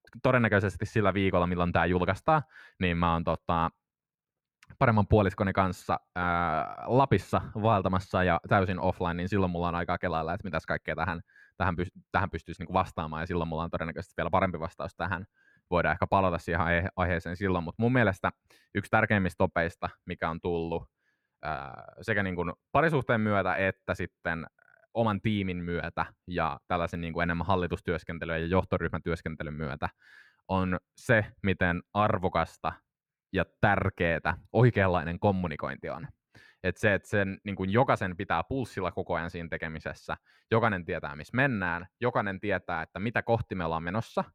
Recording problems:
muffled; slightly; fading above 3 kHz

